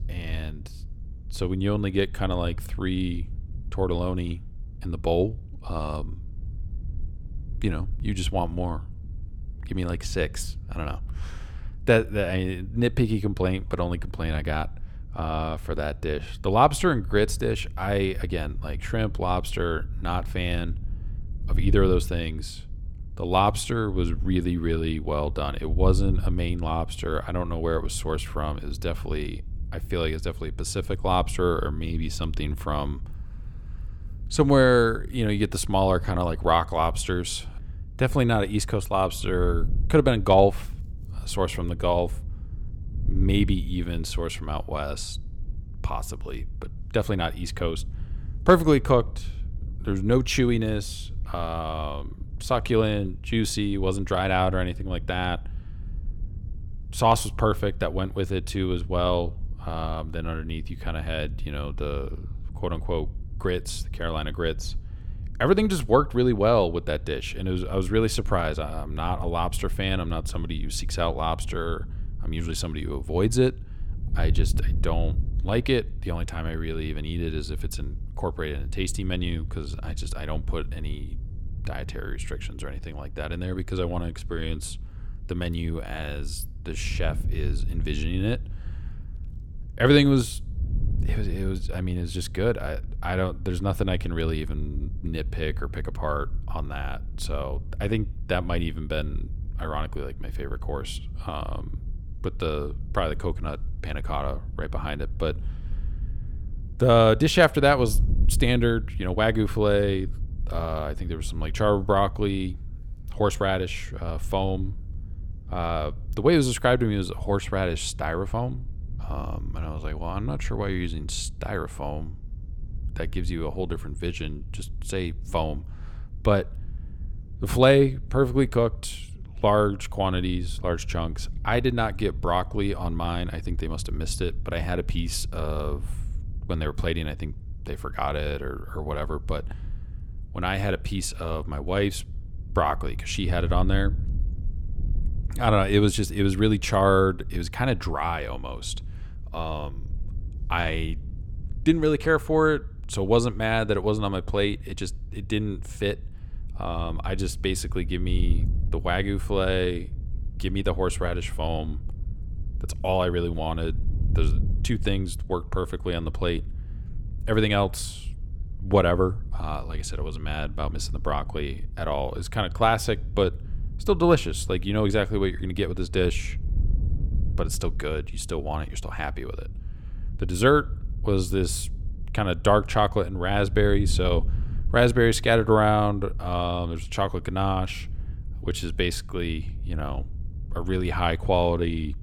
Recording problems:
wind noise on the microphone; occasional gusts; 25 dB below the speech

